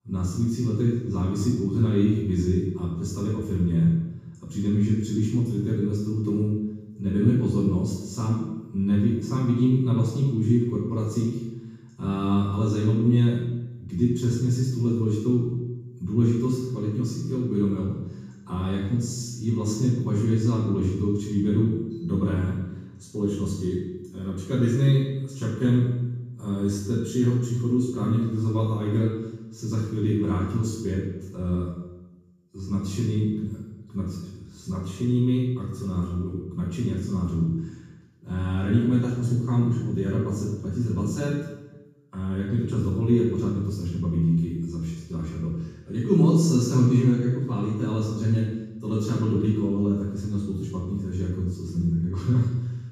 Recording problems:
room echo; strong; dies away in 1.1 s
off-mic speech; far

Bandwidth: 15 kHz